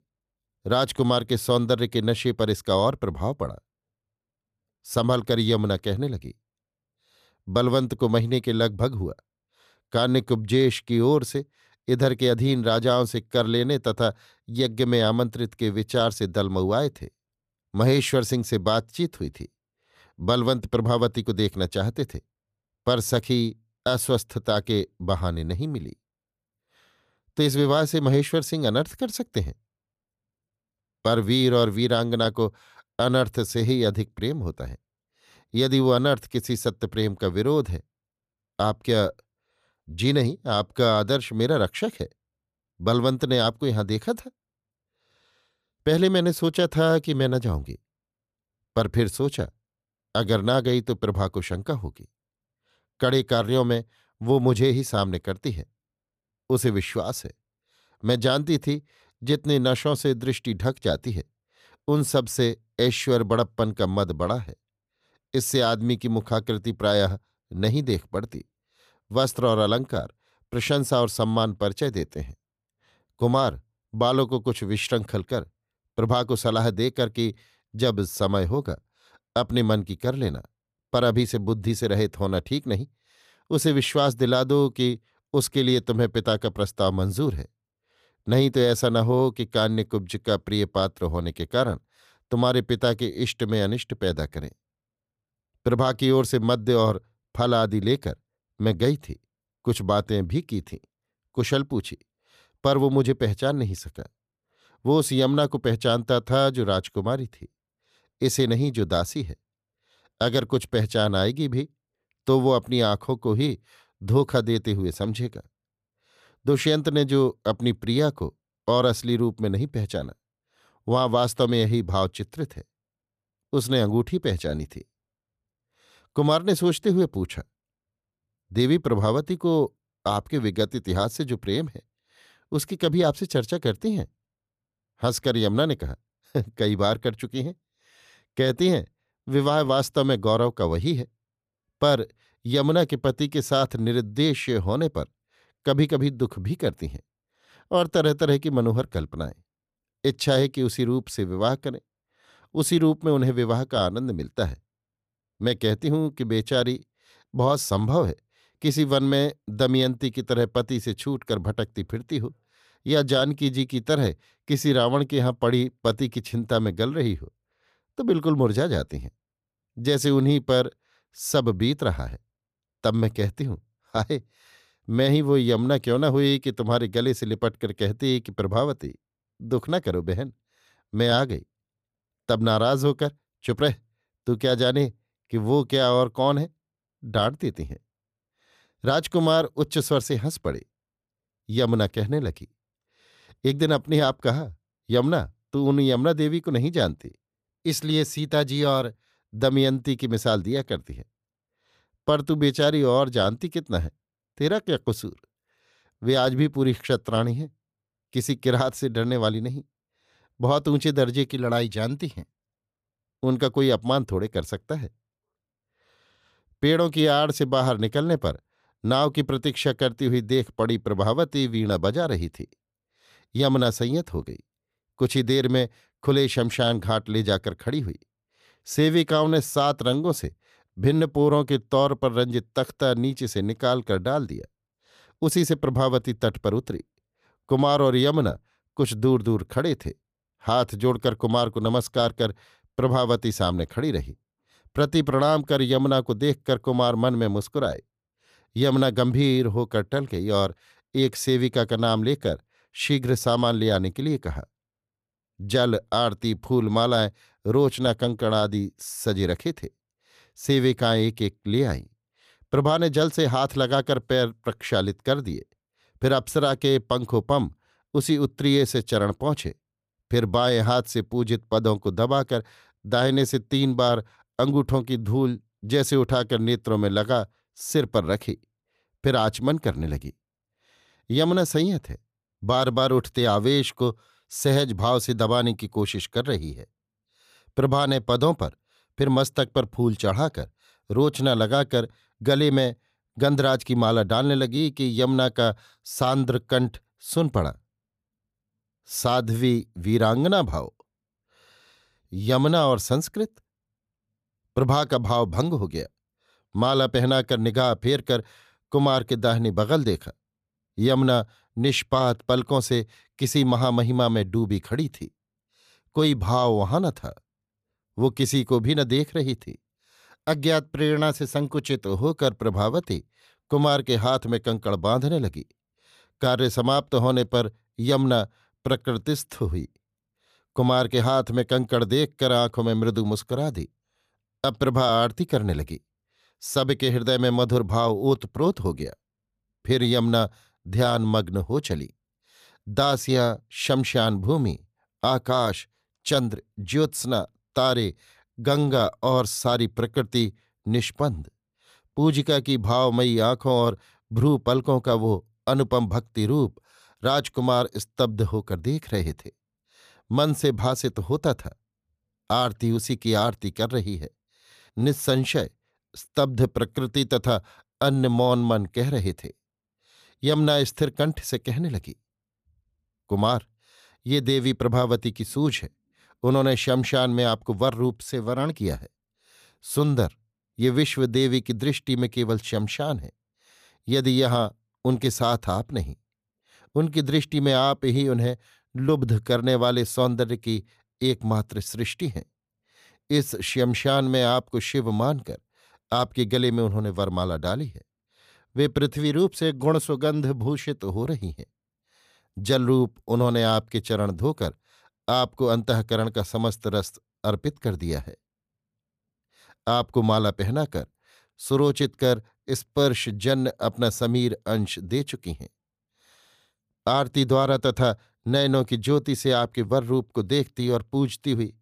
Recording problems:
none

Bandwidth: 14.5 kHz